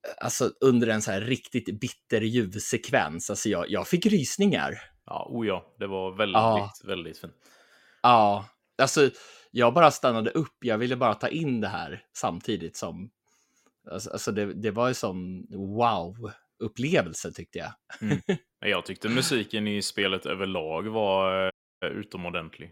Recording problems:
audio cutting out; at 22 s

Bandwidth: 16 kHz